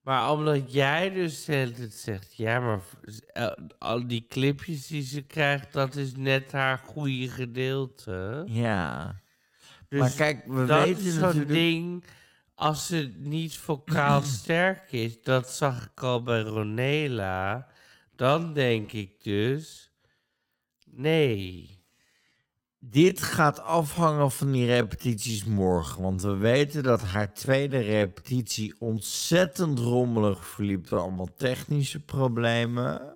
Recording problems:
wrong speed, natural pitch; too slow; 0.6 times normal speed

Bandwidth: 16.5 kHz